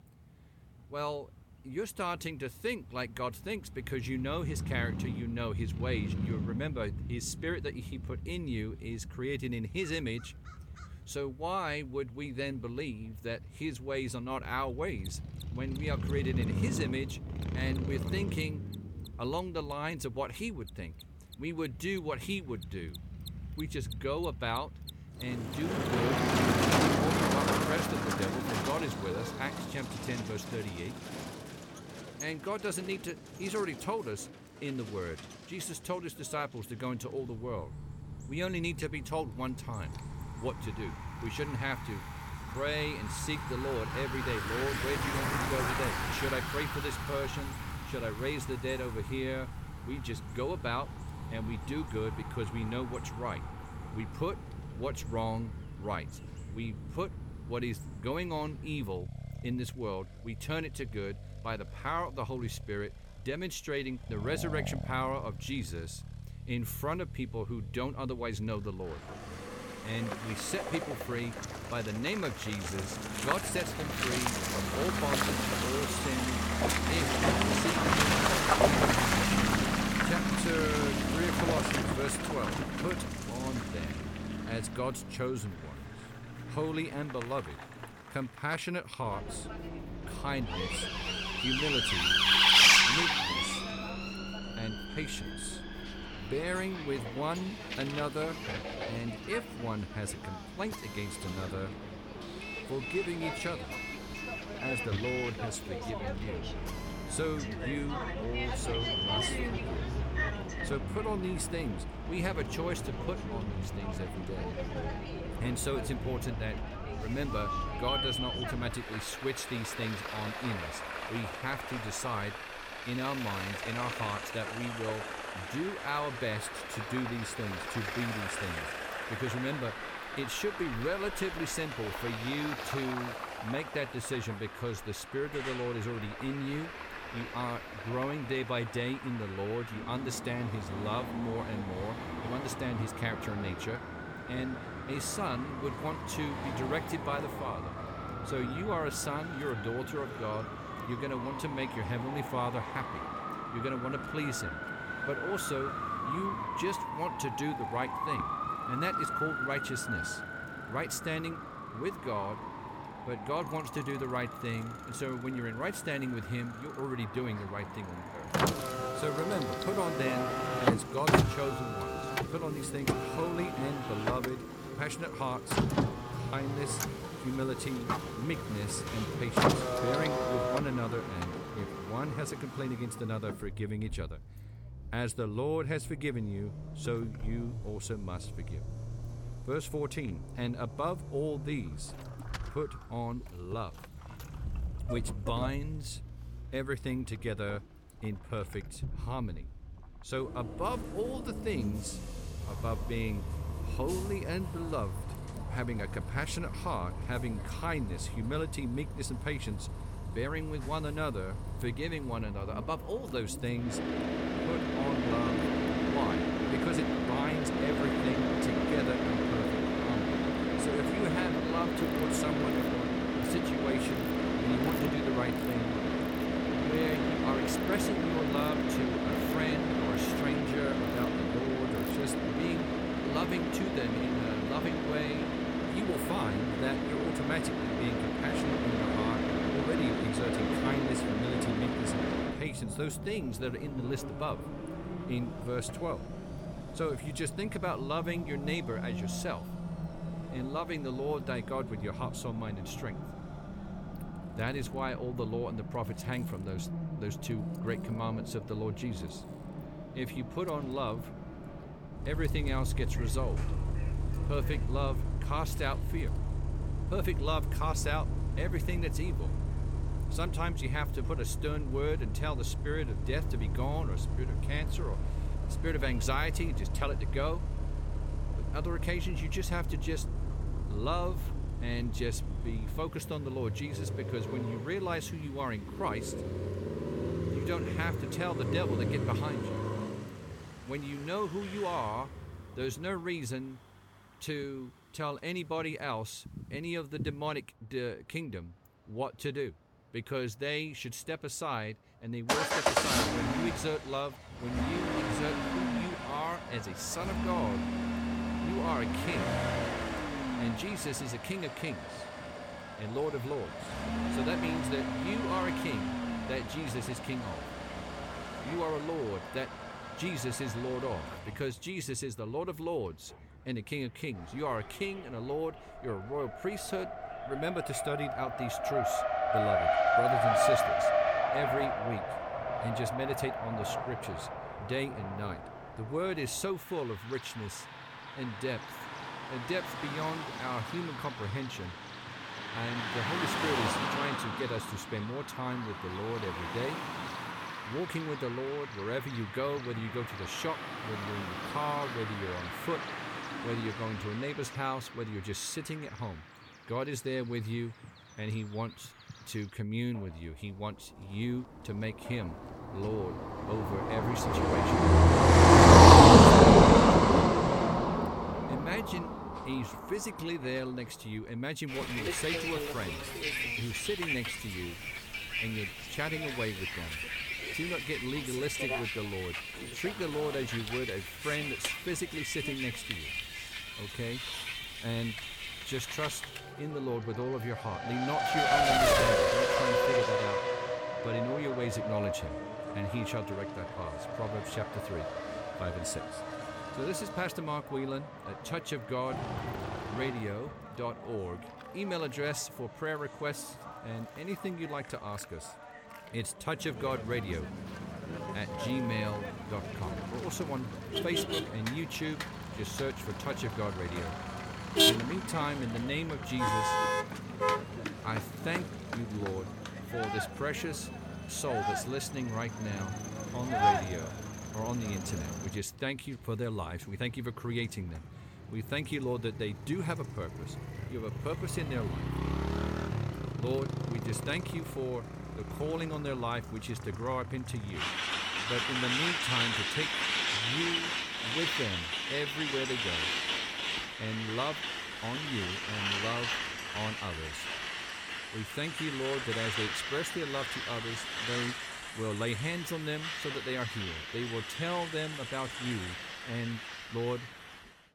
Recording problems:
traffic noise; very loud; throughout; 4 dB above the speech
machinery noise; faint; throughout; 25 dB below the speech

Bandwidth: 17 kHz